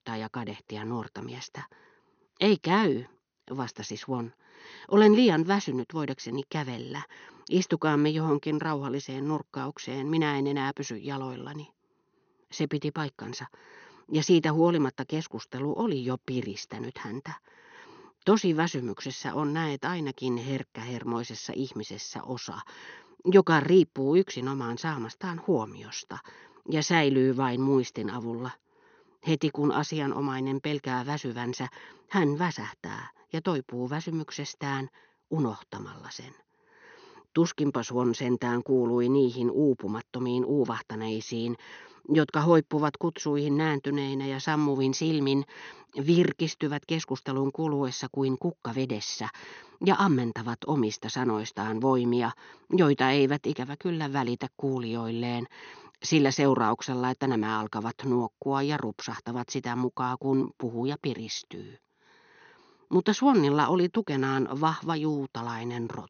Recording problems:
high frequencies cut off; noticeable; nothing above 6.5 kHz

